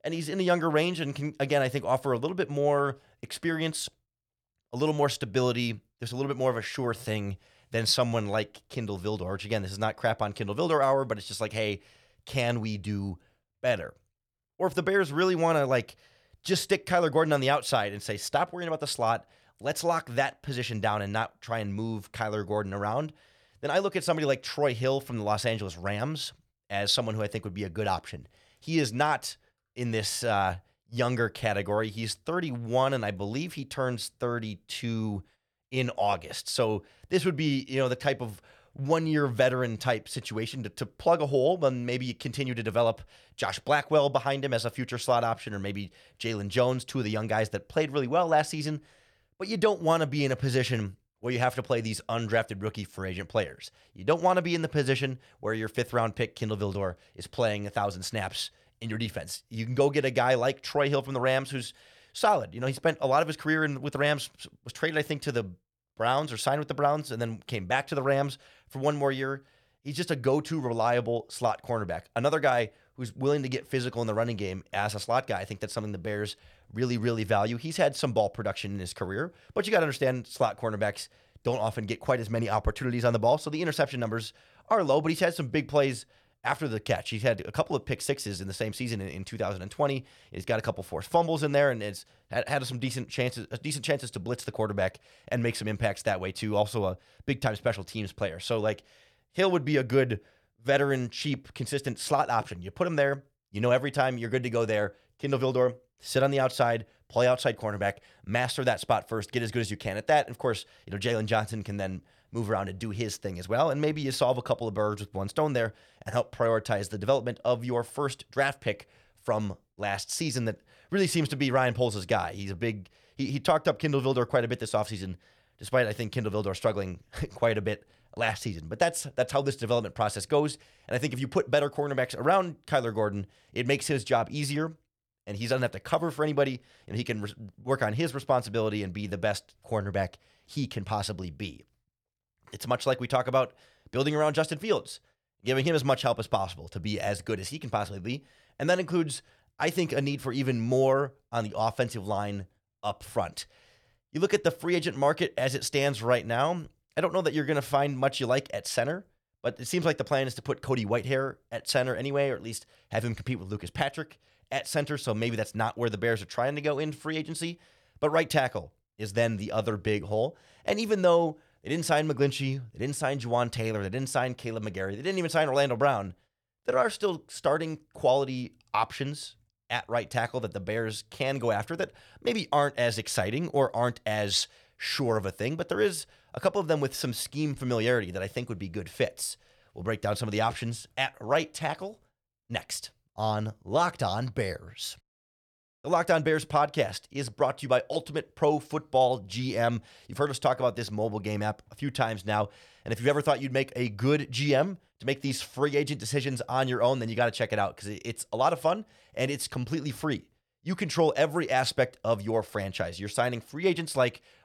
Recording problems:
none

